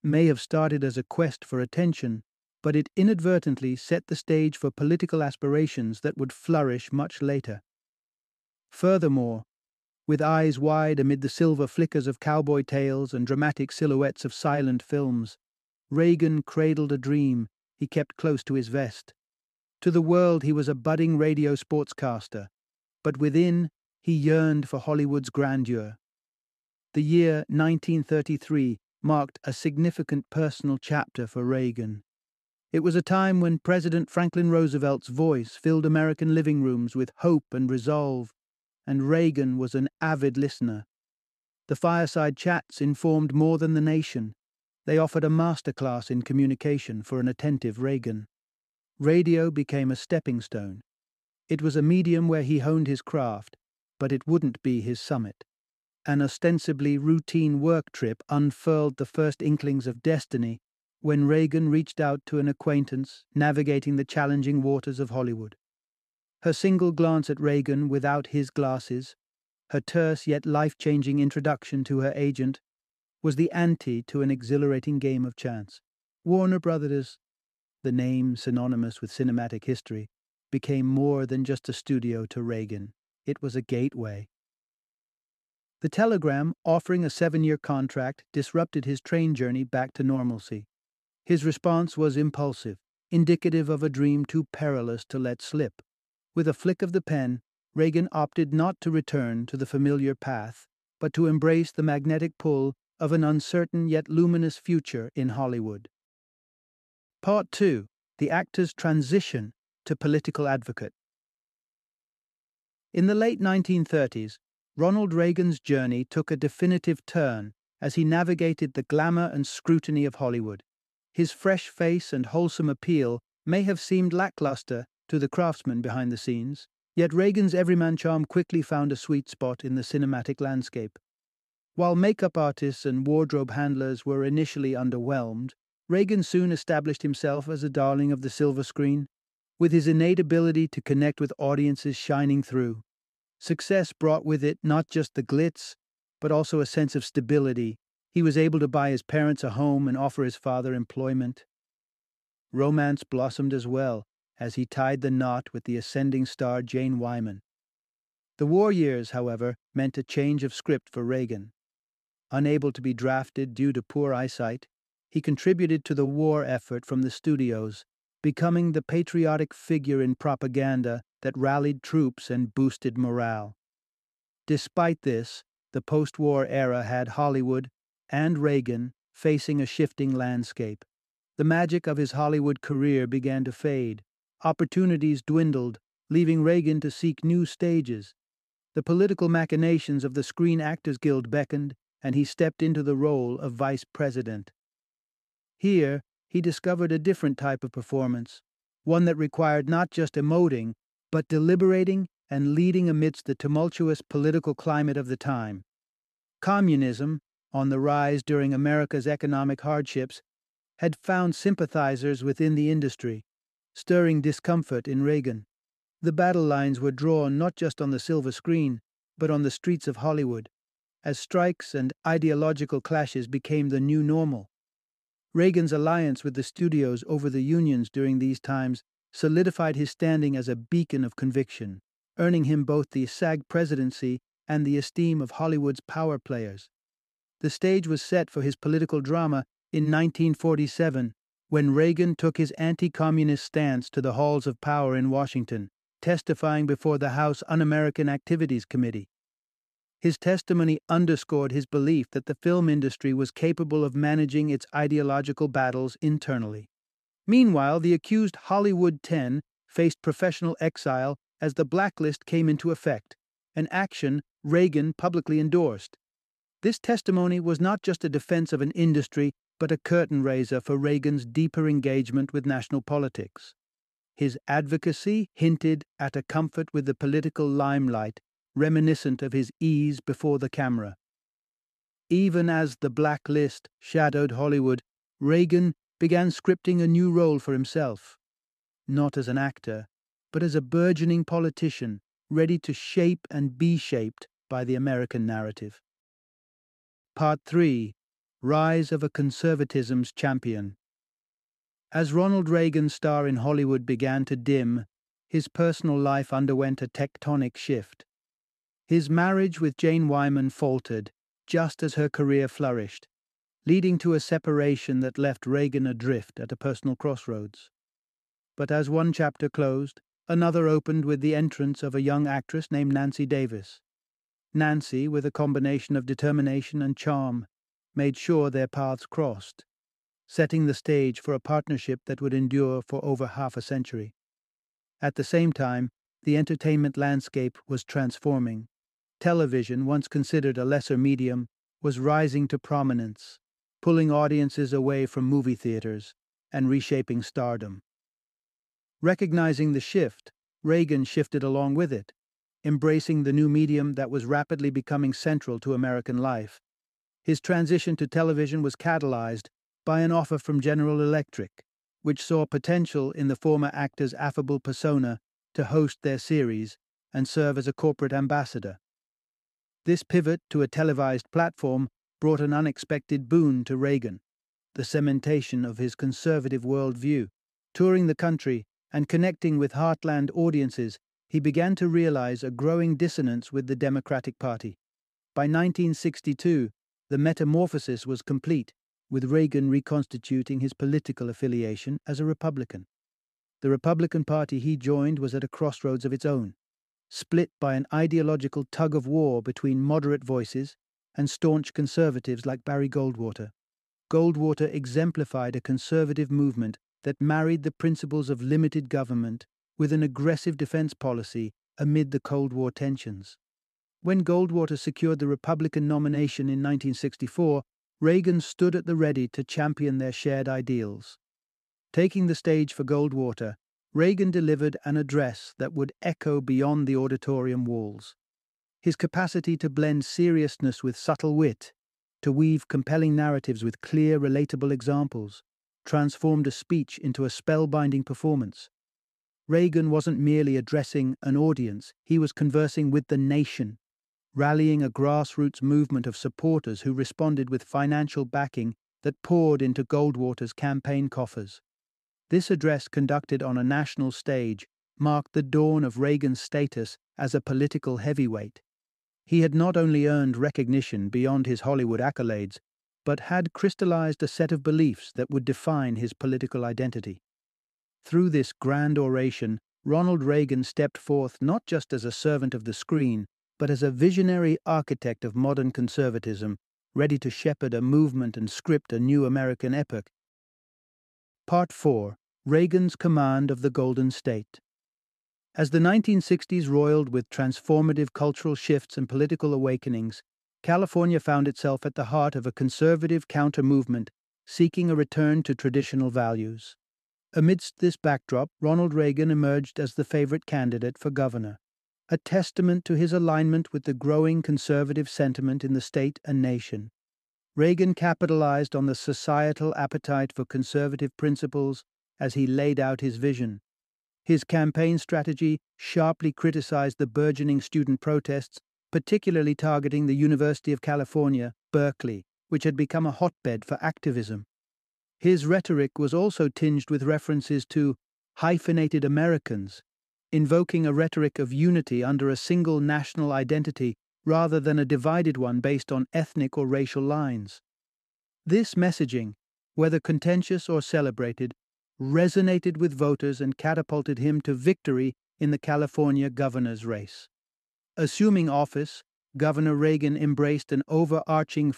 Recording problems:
none

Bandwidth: 13.5 kHz